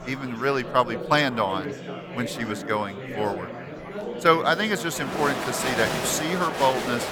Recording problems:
murmuring crowd; loud; throughout; 7 dB below the speech

